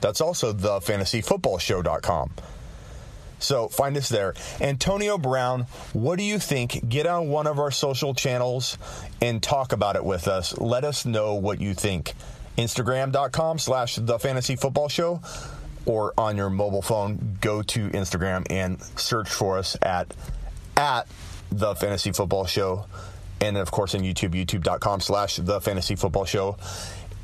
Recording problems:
squashed, flat; heavily

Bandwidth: 14.5 kHz